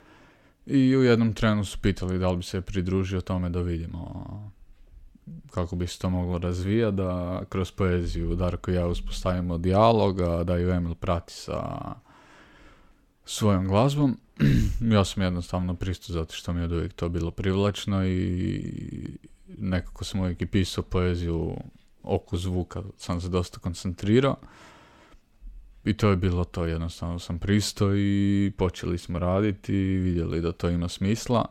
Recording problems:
none

